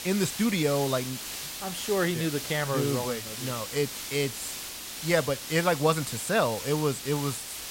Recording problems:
hiss; loud; throughout; 7 dB below the speech

